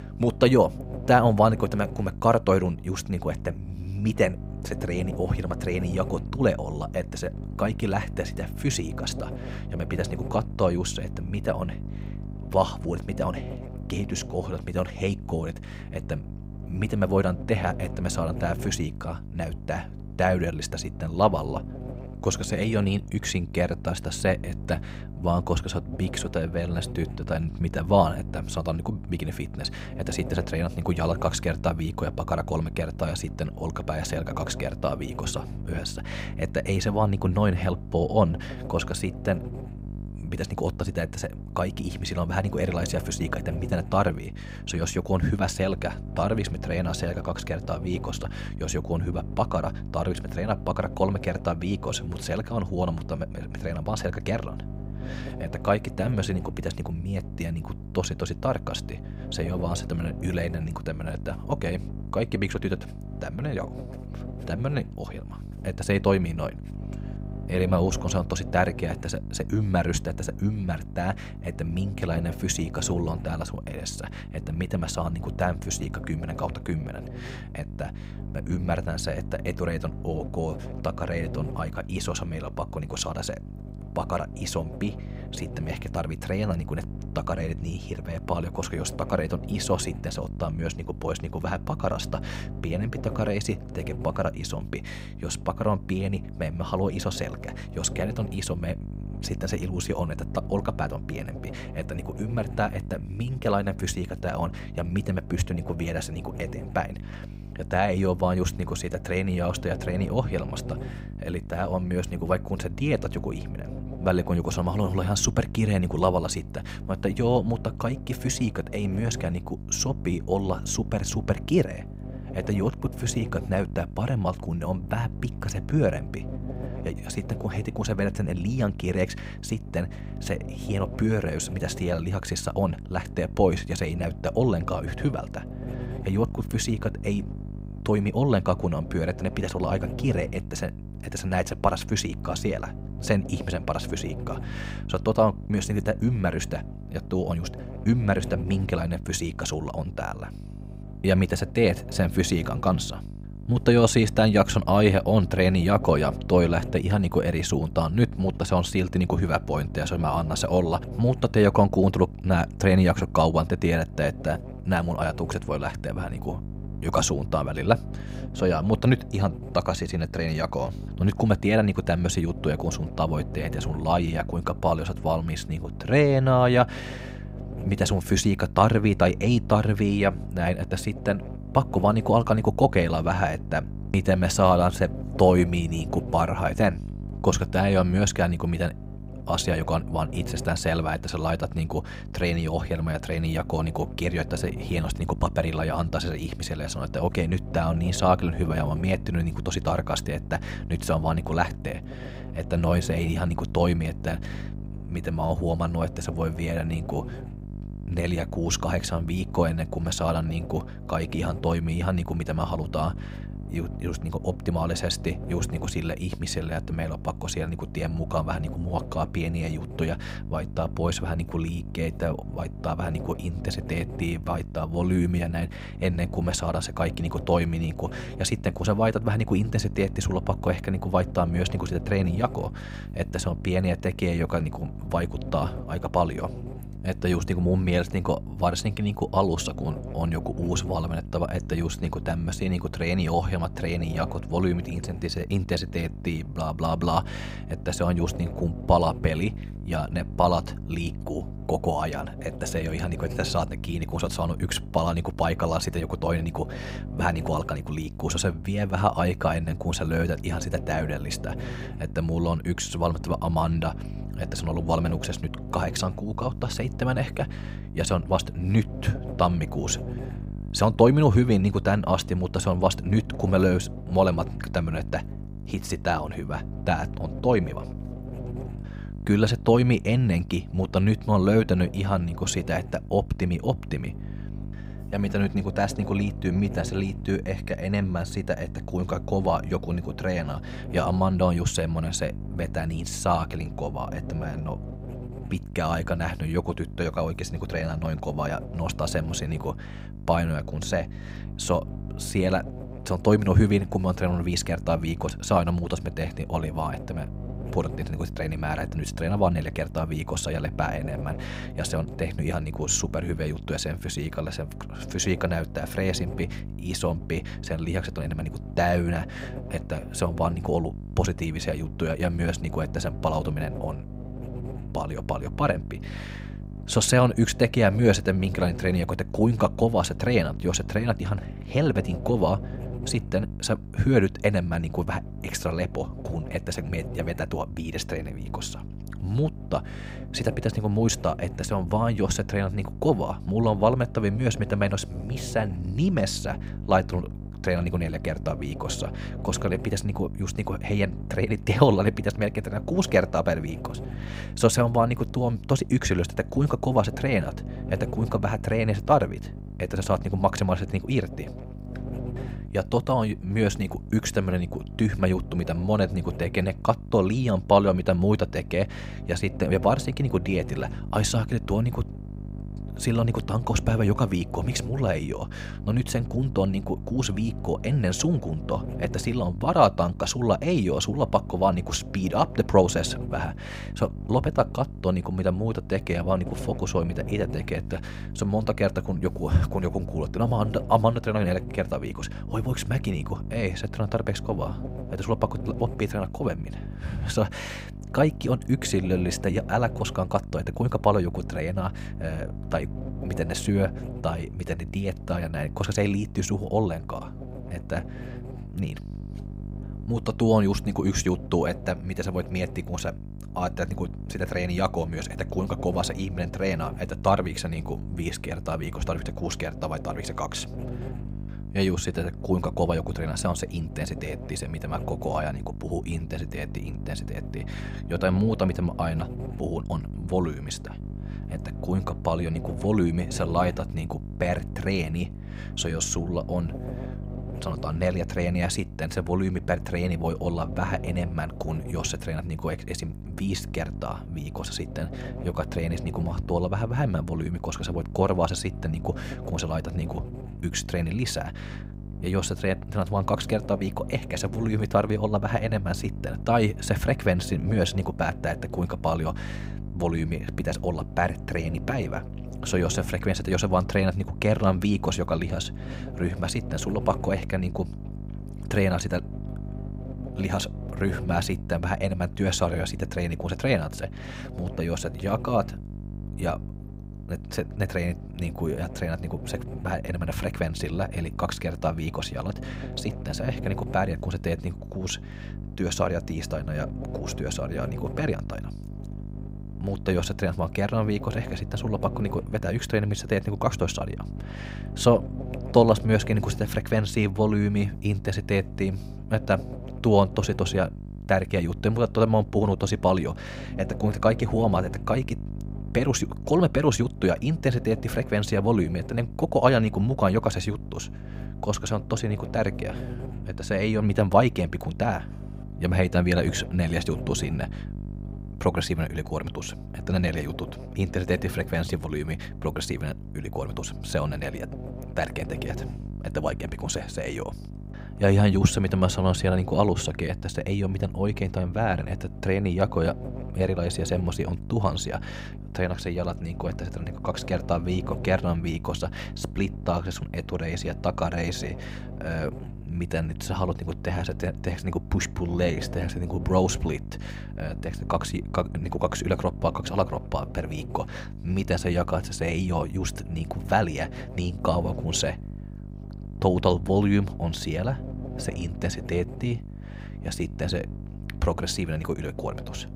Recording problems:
electrical hum; noticeable; throughout; 50 Hz, 15 dB below the speech

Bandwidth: 15.5 kHz